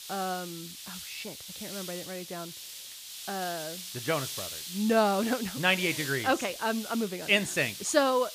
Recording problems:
hiss; loud; throughout; 10 dB below the speech

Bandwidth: 15 kHz